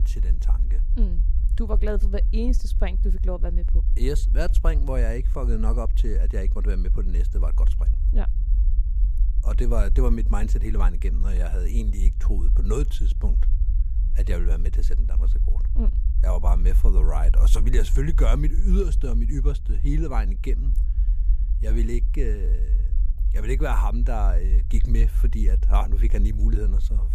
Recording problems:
low rumble; noticeable; throughout; 10 dB below the speech

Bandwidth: 15 kHz